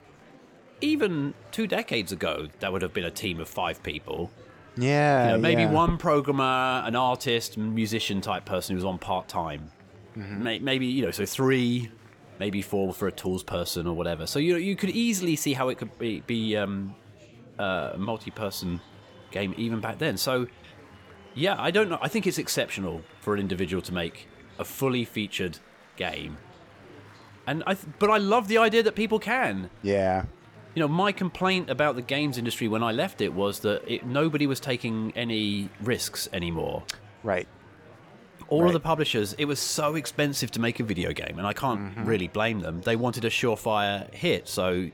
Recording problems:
murmuring crowd; faint; throughout; 25 dB below the speech

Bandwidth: 17.5 kHz